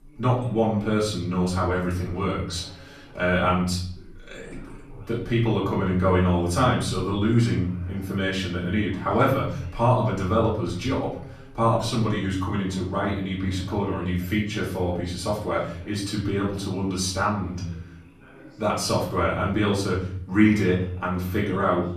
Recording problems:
off-mic speech; far
room echo; noticeable; dies away in 0.7 s
background chatter; faint; throughout; 2 voices, 25 dB below the speech

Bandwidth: 14.5 kHz